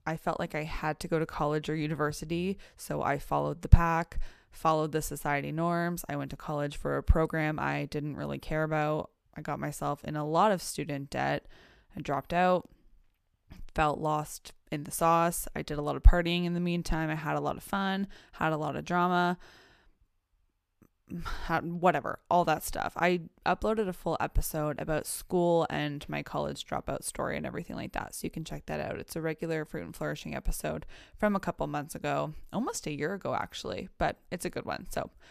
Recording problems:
none

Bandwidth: 14.5 kHz